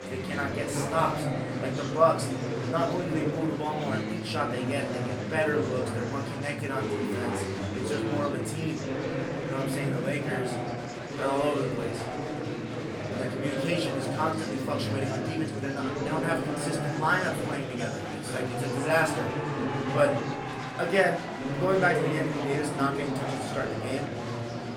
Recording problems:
off-mic speech; far
room echo; slight; dies away in 0.4 s
murmuring crowd; loud; throughout; 1 dB below the speech
background music; faint; throughout; 20 dB below the speech

